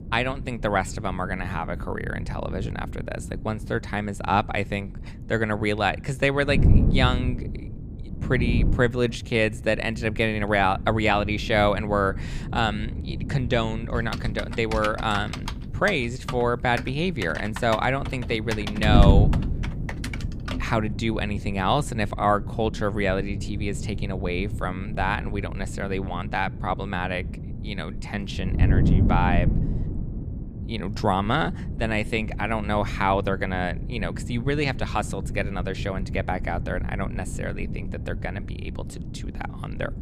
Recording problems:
wind noise on the microphone; occasional gusts; 15 dB below the speech
keyboard typing; noticeable; from 14 to 21 s; peak 7 dB below the speech

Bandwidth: 15 kHz